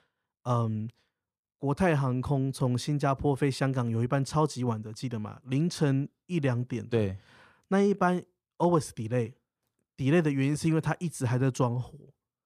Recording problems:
none

